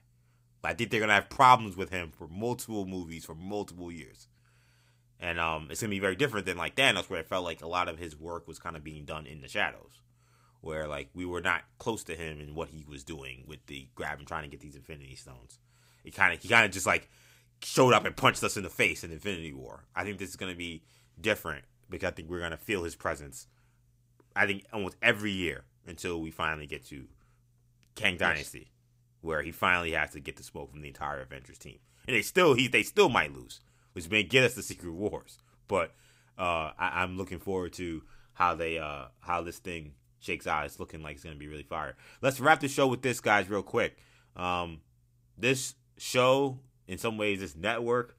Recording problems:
none

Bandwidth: 15.5 kHz